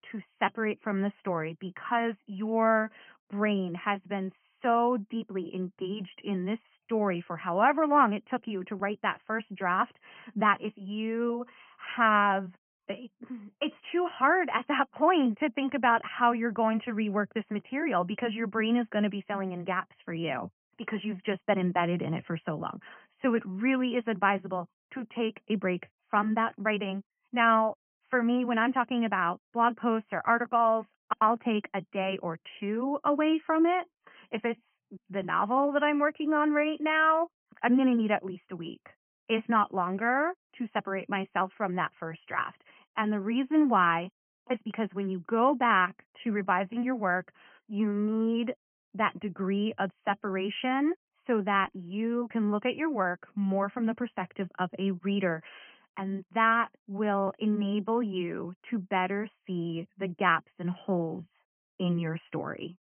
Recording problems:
high frequencies cut off; severe; nothing above 3 kHz

